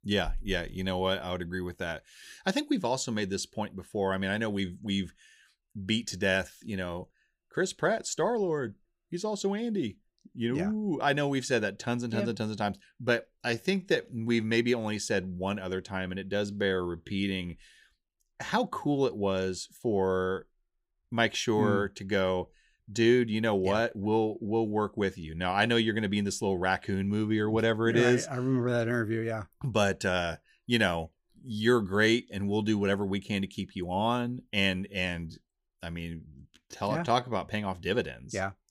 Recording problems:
uneven, jittery; strongly; from 13 to 37 s

